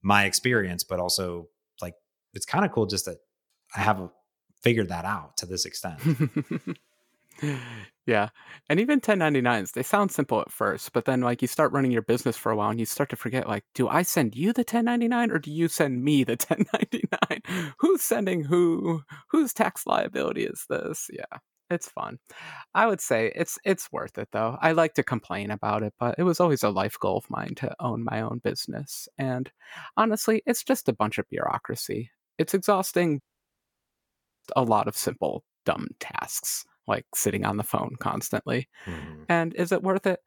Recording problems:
audio cutting out; at 33 s for 1 s

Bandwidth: 18.5 kHz